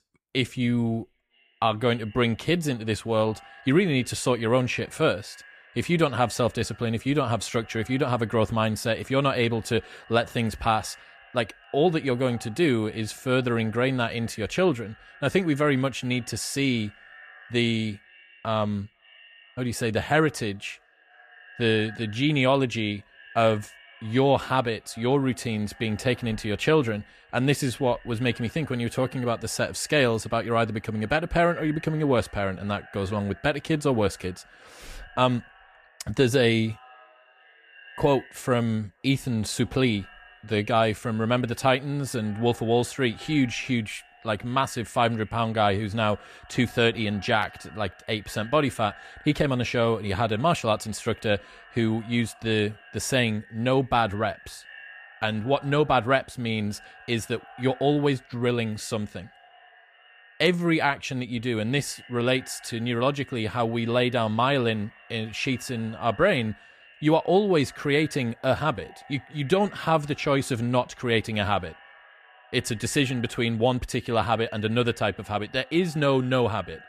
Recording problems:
echo of what is said; faint; throughout; 470 ms later, 25 dB below the speech

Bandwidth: 14.5 kHz